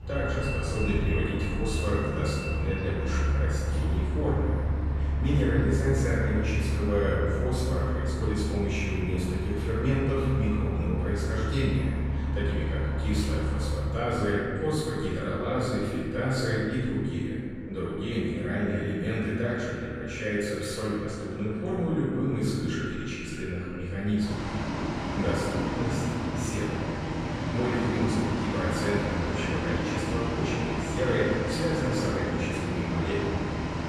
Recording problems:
room echo; strong; dies away in 1.9 s
off-mic speech; far
echo of what is said; noticeable; from 18 s on; 270 ms later, 15 dB below the speech
traffic noise; loud; throughout; 1 dB below the speech

